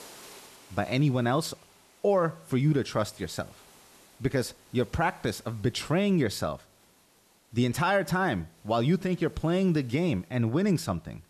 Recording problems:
hiss; faint; throughout; 25 dB below the speech

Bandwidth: 13.5 kHz